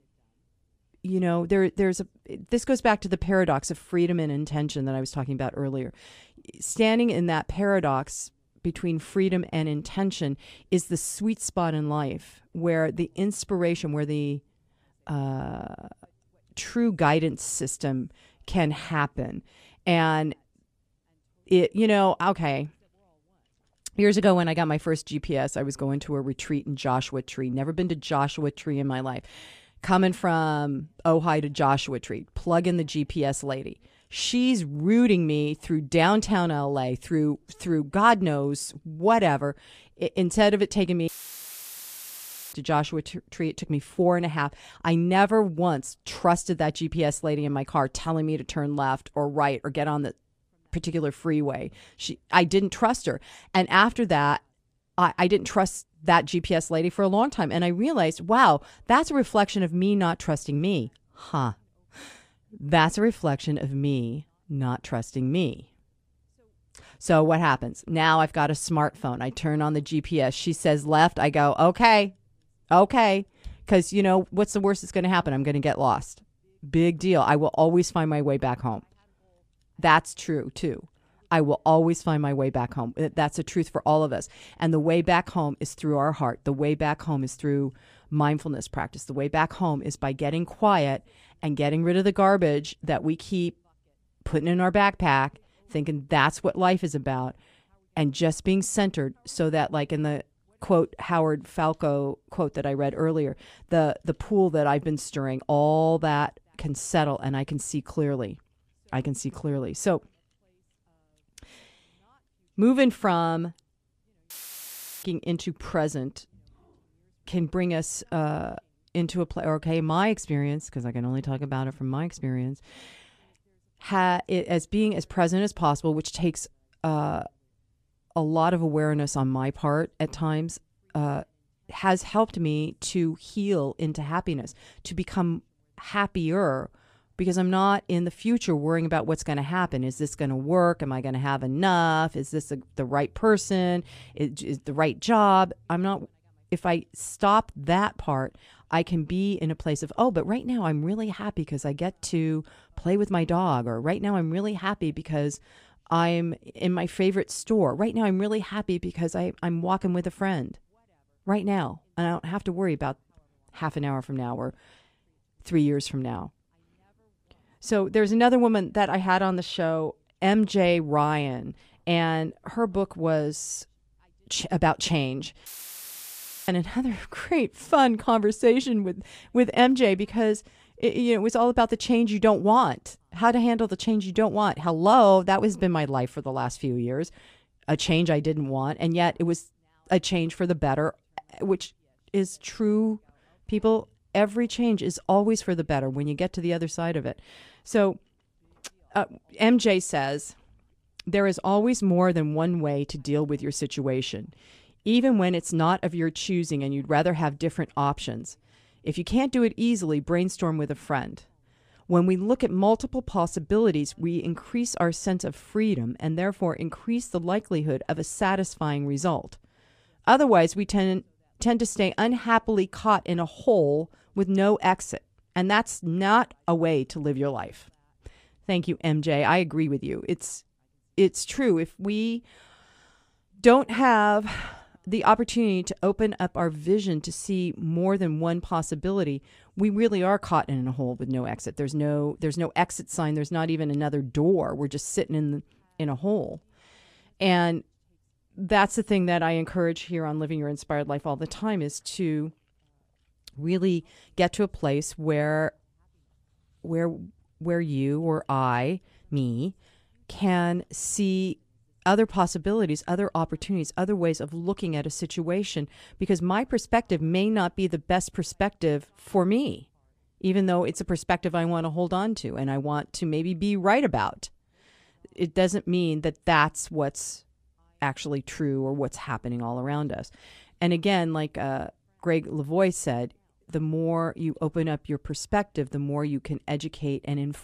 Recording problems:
audio cutting out; filled with static; at 41 s for 1.5 s, at 1:54 for 0.5 s and at 2:55 for 1 s

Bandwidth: 14.5 kHz